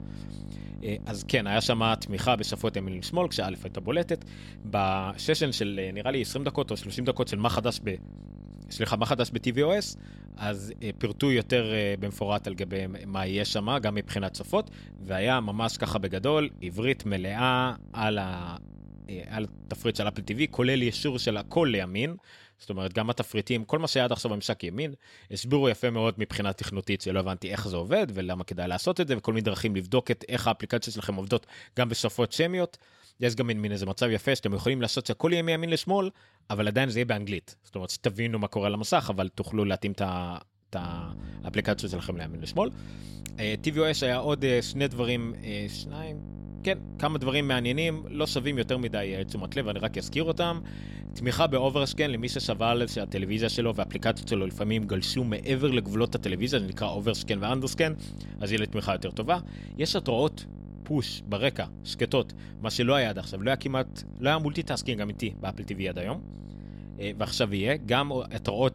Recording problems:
electrical hum; faint; until 22 s and from 41 s on; 50 Hz, 20 dB below the speech

